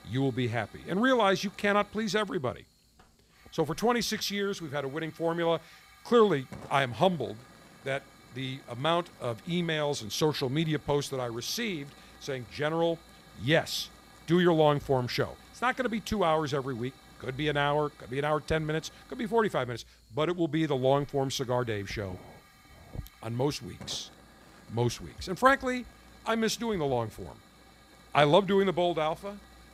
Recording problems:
hiss; faint; throughout; 25 dB below the speech

